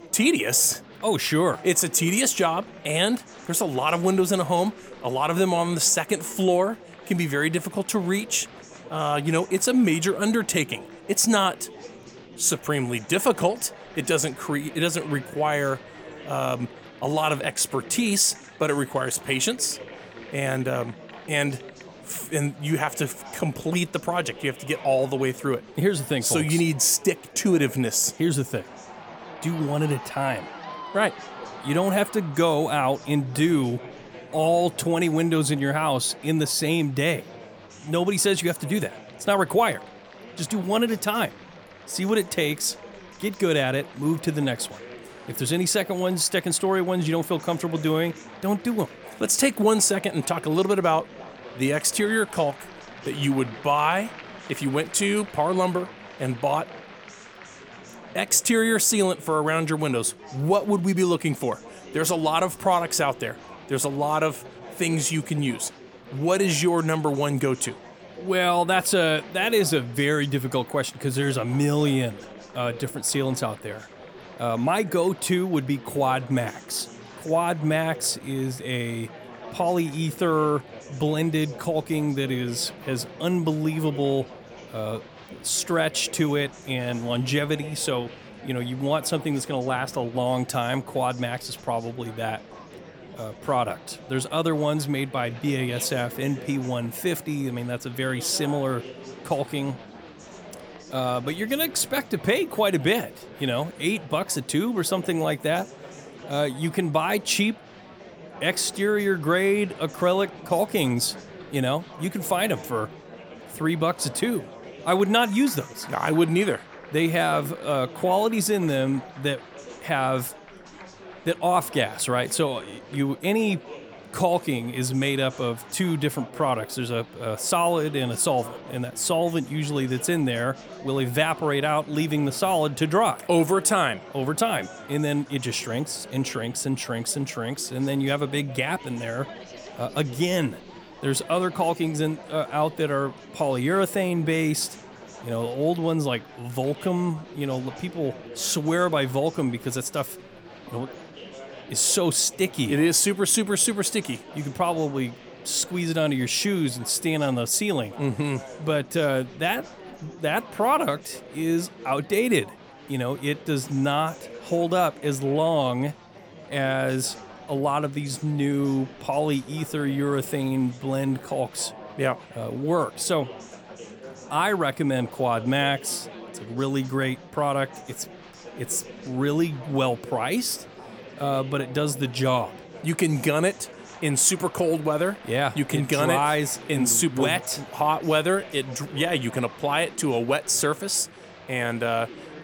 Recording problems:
murmuring crowd; noticeable; throughout; 20 dB below the speech

